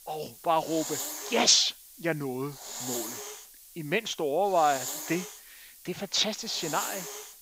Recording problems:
high frequencies cut off; noticeable; nothing above 8 kHz
hiss; loud; throughout; 9 dB below the speech

